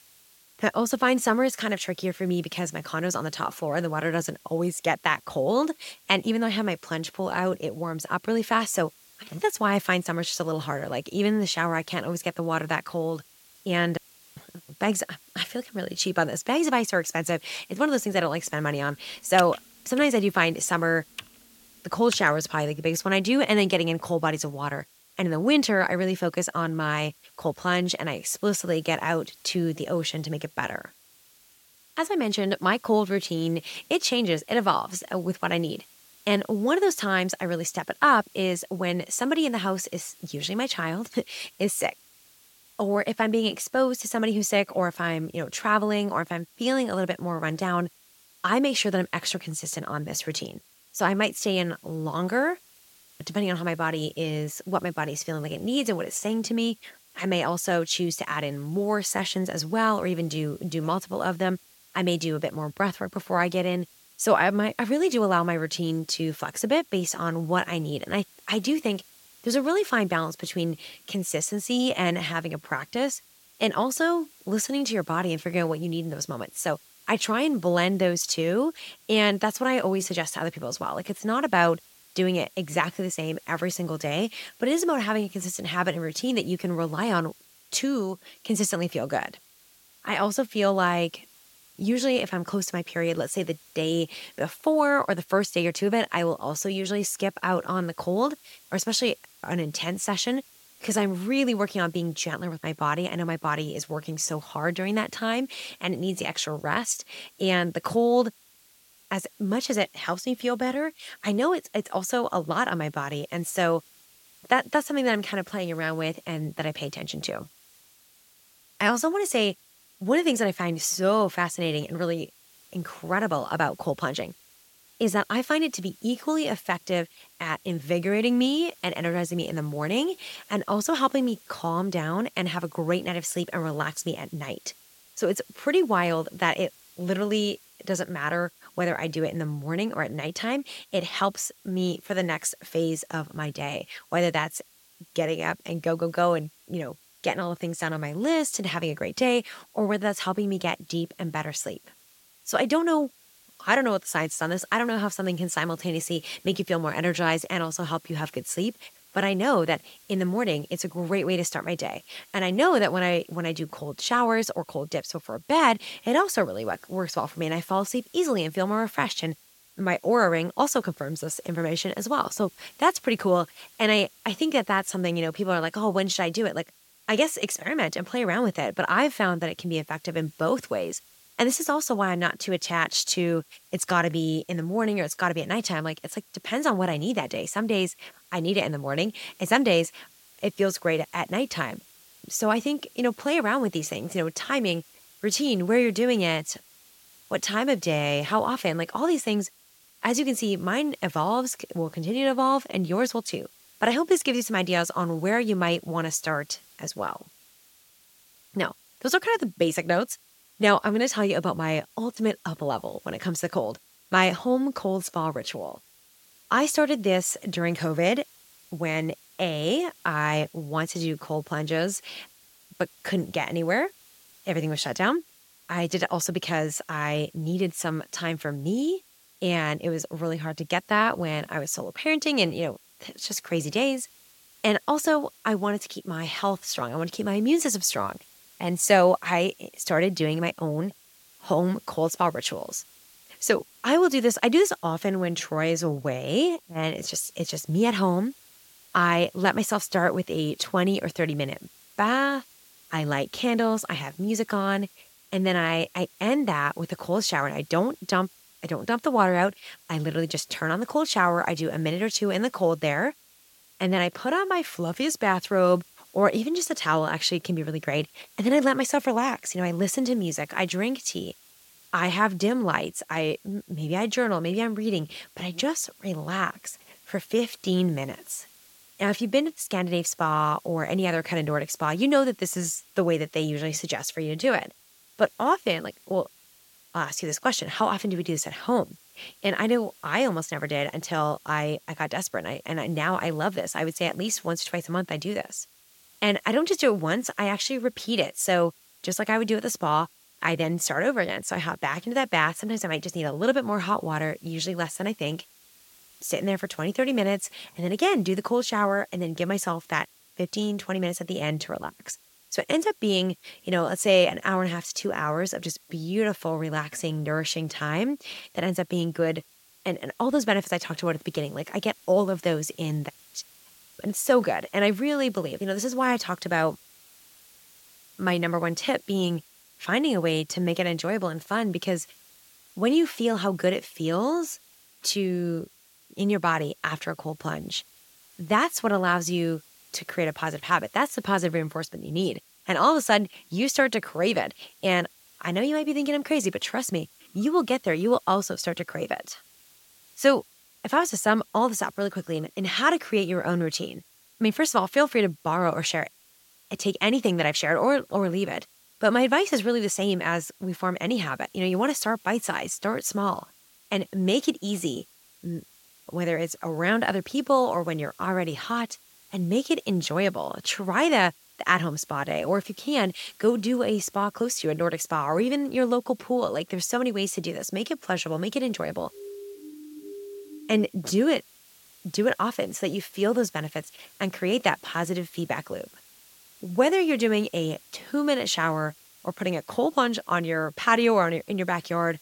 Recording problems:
hiss; faint; throughout; 25 dB below the speech
keyboard typing; noticeable; from 19 to 22 s; peak 6 dB below the speech
siren; faint; from 6:19 to 6:21; peak 15 dB below the speech

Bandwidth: 16.5 kHz